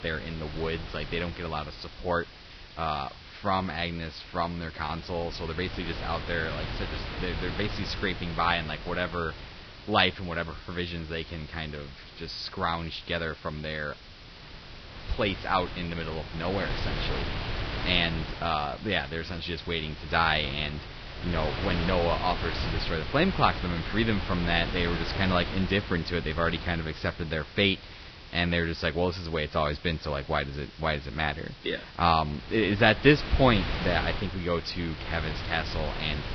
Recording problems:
garbled, watery; badly; nothing above 5.5 kHz
wind noise on the microphone; heavy; 9 dB below the speech
hiss; faint; throughout; 20 dB below the speech

